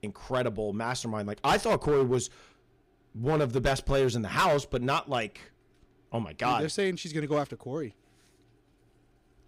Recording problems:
distortion; slight; 4% of the sound clipped

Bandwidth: 15.5 kHz